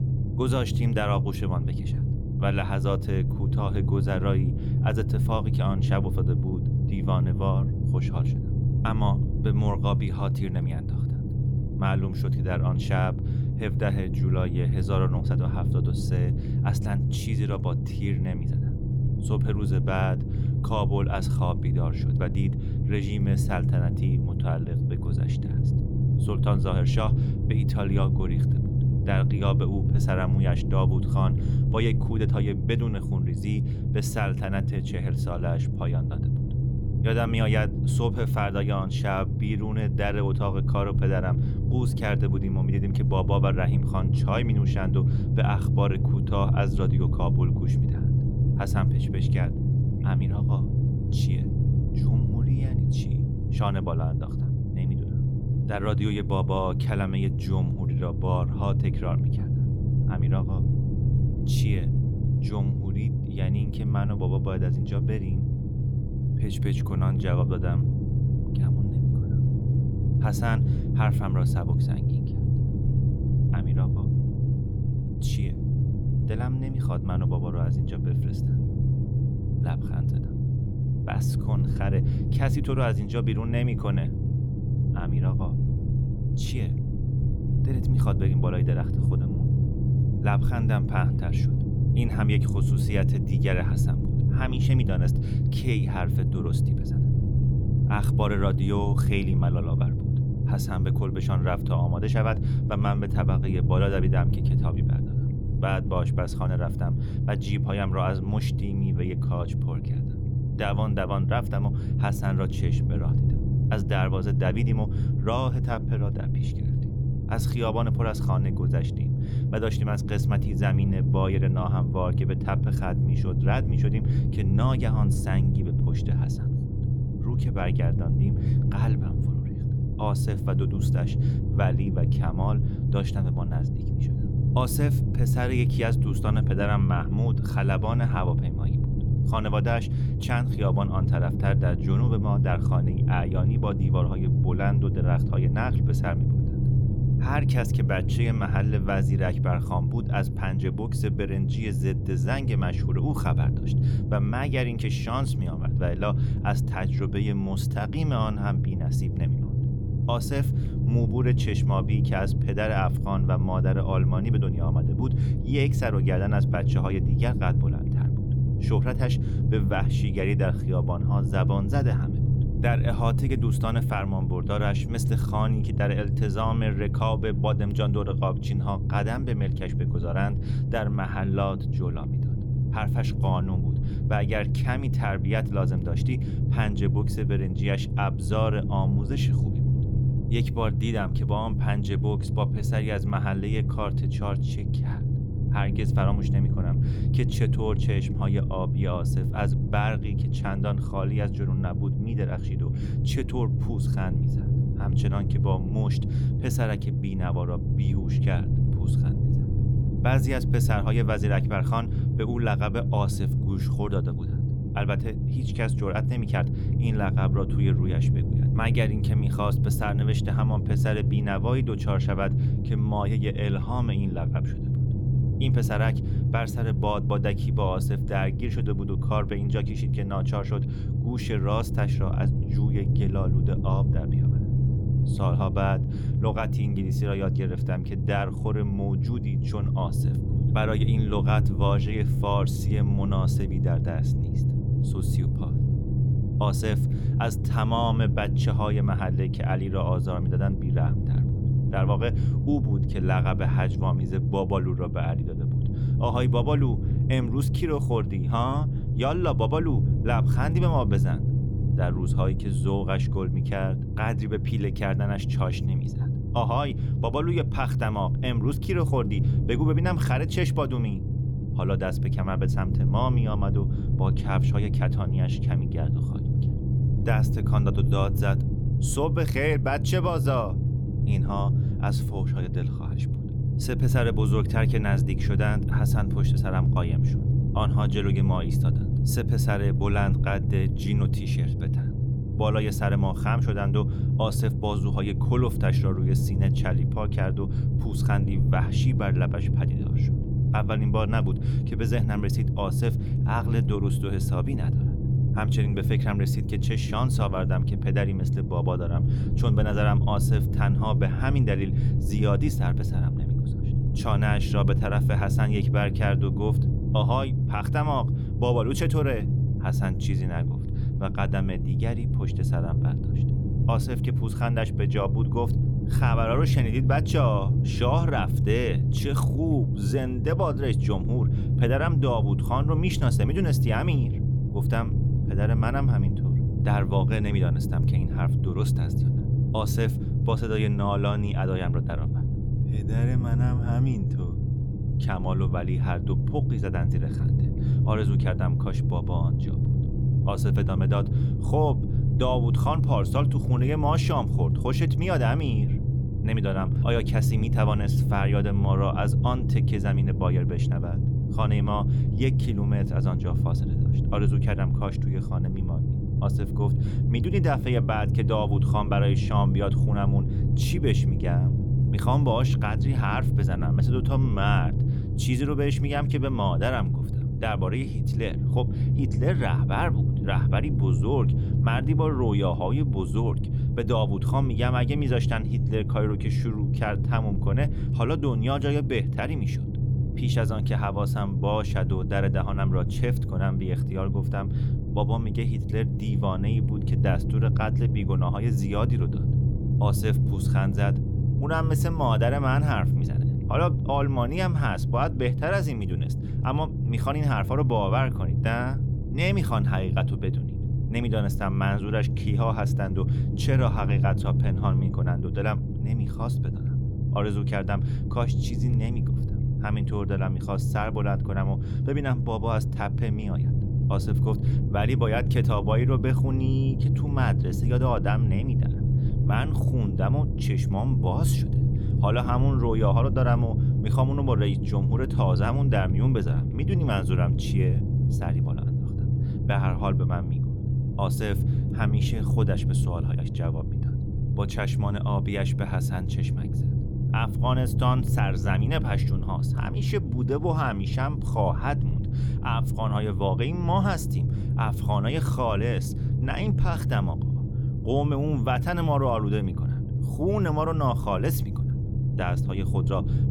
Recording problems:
low rumble; loud; throughout; 5 dB below the speech

